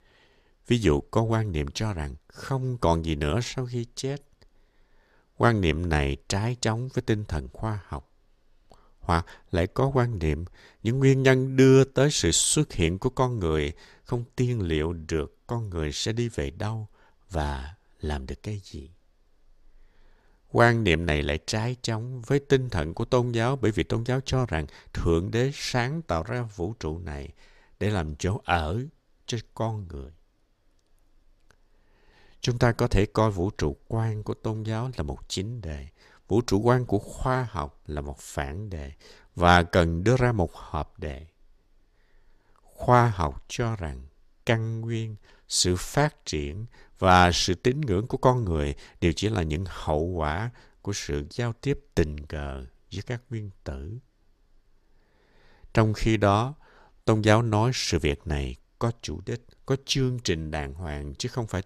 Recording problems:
none

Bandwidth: 14.5 kHz